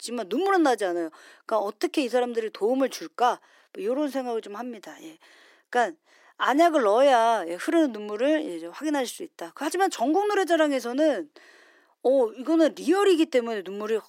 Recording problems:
thin; somewhat; fading below 300 Hz

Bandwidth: 16 kHz